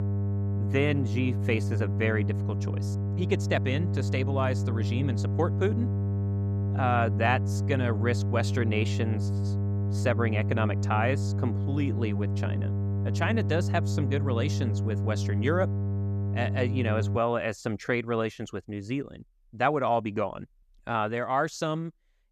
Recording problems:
electrical hum; loud; until 17 s; 50 Hz, 10 dB below the speech

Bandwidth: 14.5 kHz